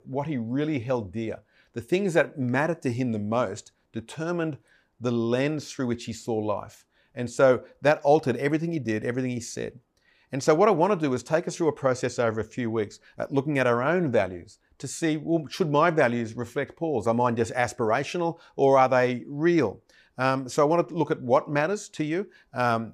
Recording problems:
none

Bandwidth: 15 kHz